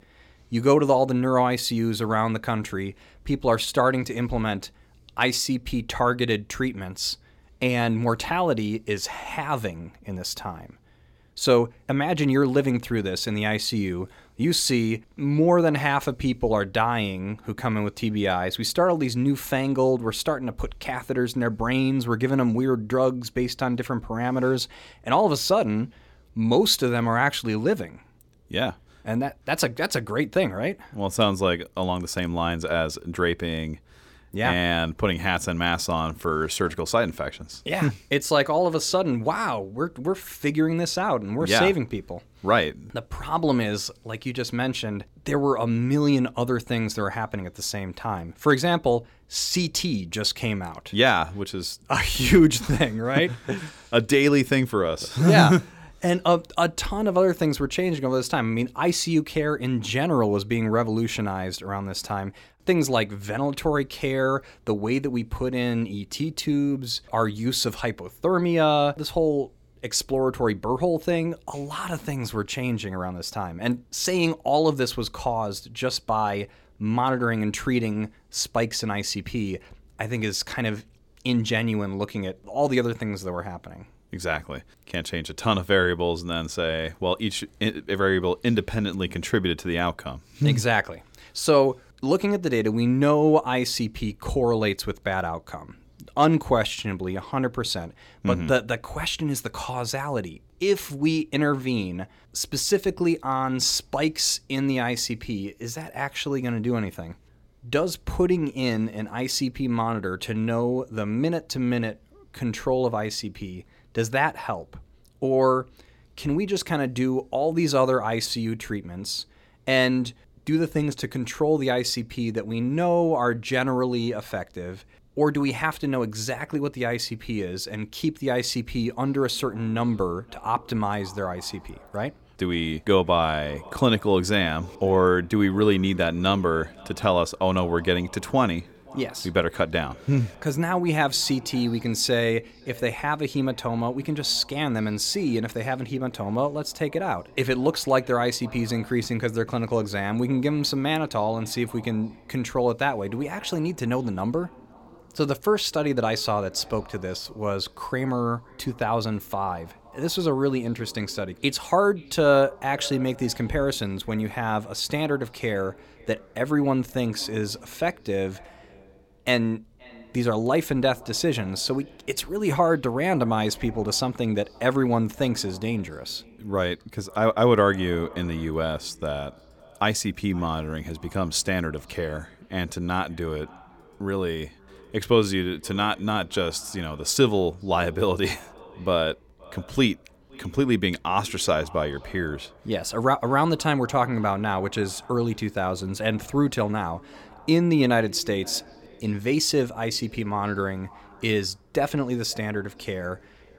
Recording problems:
echo of what is said; faint; from 2:09 on; 520 ms later, 25 dB below the speech

